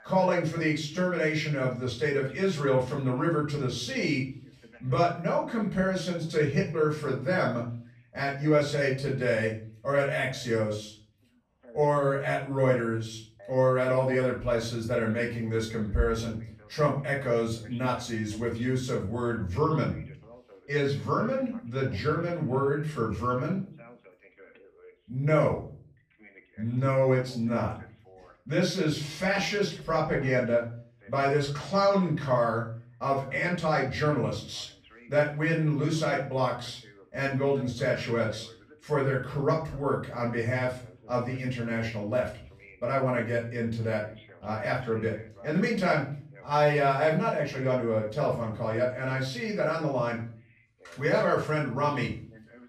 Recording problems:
off-mic speech; far
room echo; slight; dies away in 0.4 s
voice in the background; faint; throughout; 25 dB below the speech

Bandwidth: 14.5 kHz